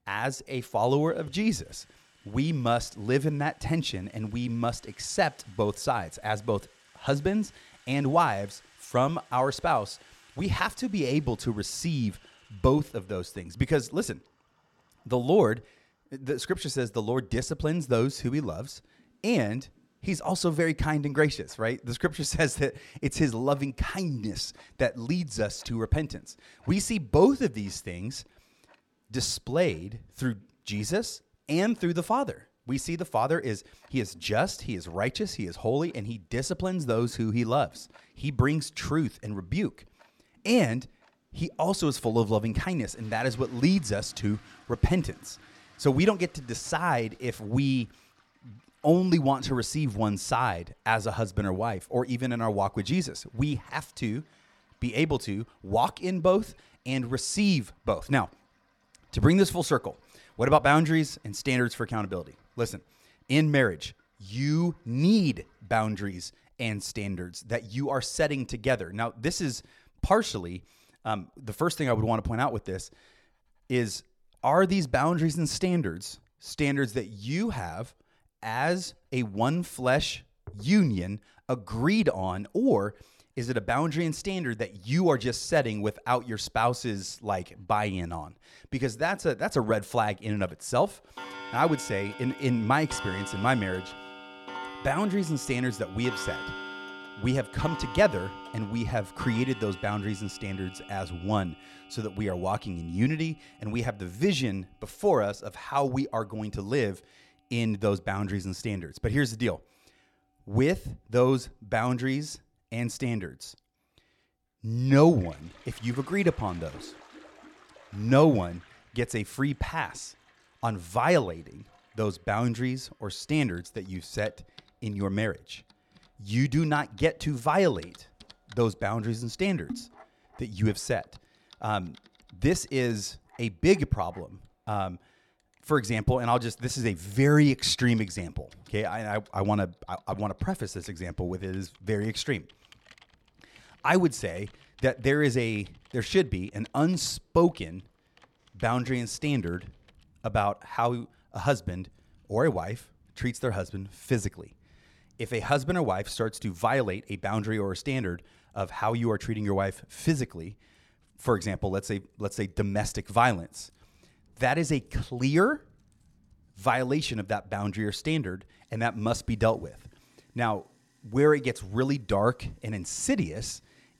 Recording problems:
household noises; noticeable; throughout; 20 dB below the speech

